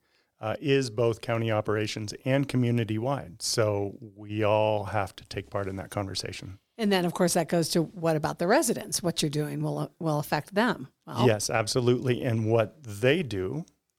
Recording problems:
none

